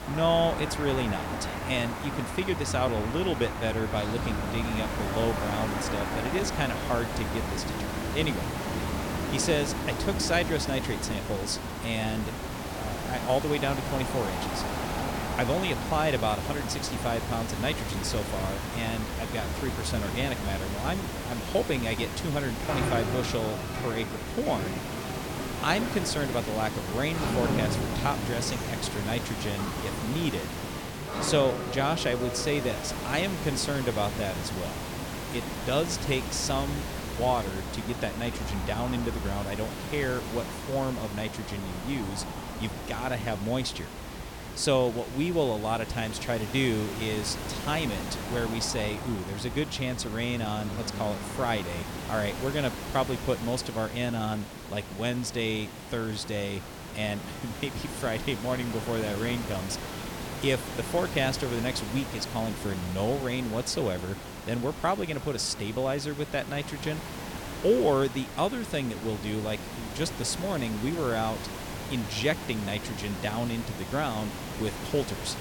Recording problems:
traffic noise; loud; throughout; 6 dB below the speech
hiss; loud; throughout; 6 dB below the speech

